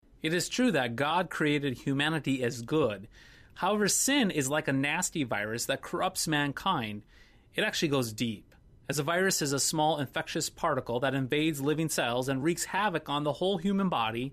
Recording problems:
none

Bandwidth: 14.5 kHz